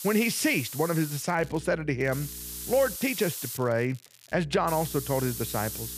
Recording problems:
hiss; loud; until 1 s, from 2 to 3.5 s and from 4.5 s on; 8 dB below the speech
electrical hum; faint; from 1.5 to 3 s and from 4.5 s on; 60 Hz, 30 dB below the speech
crackling; faint; at 1.5 s and from 2 to 4.5 s; 25 dB below the speech

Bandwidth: 14.5 kHz